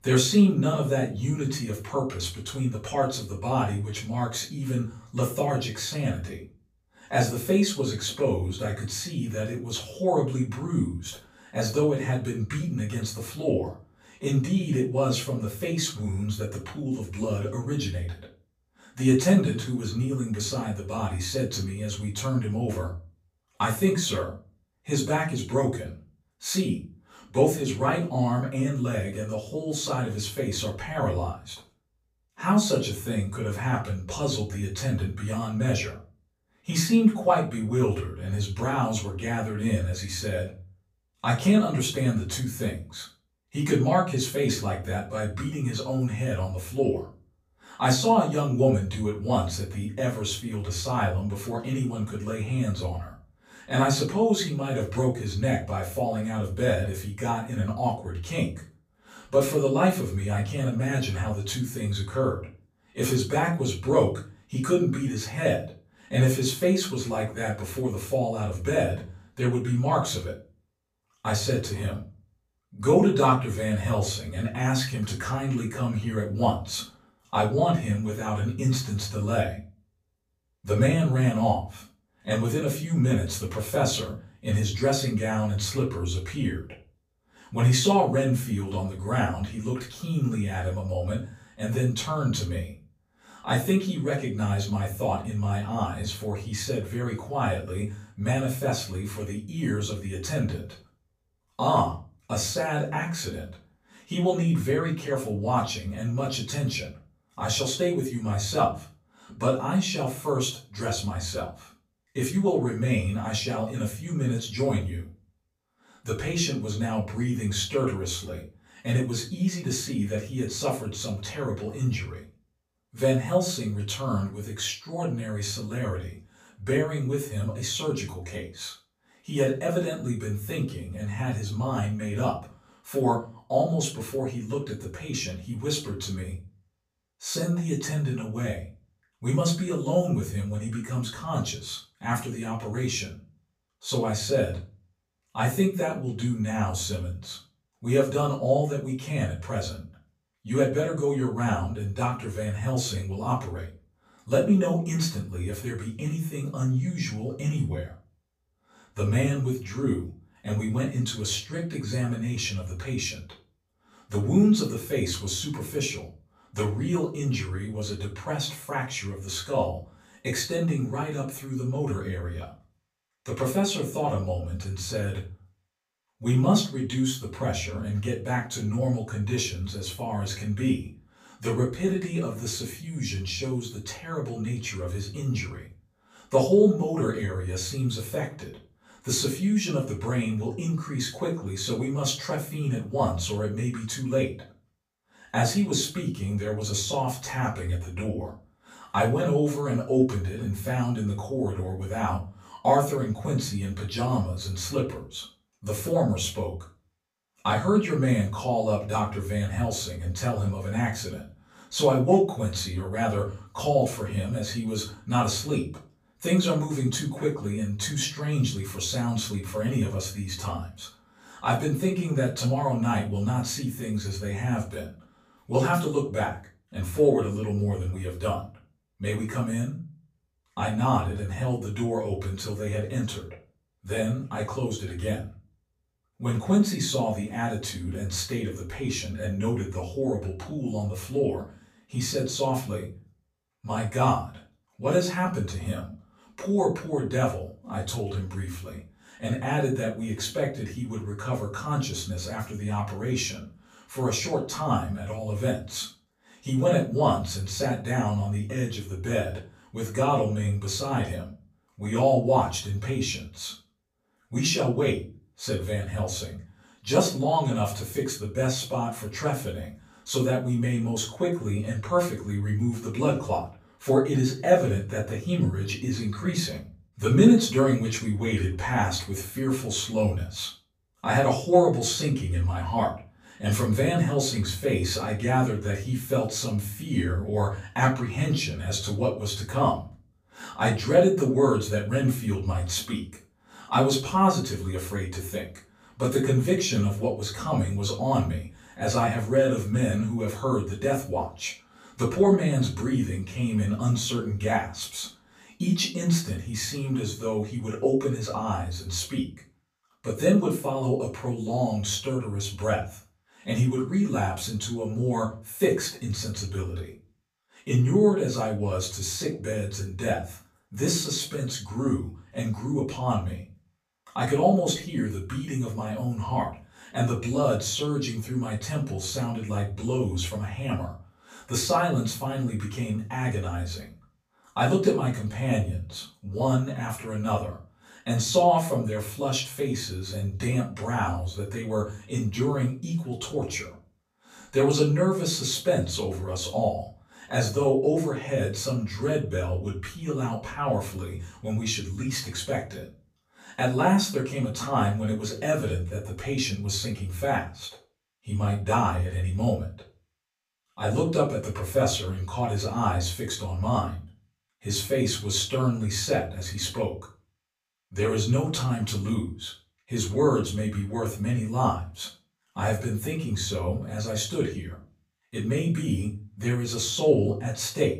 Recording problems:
off-mic speech; far
room echo; slight; dies away in 0.3 s

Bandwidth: 15 kHz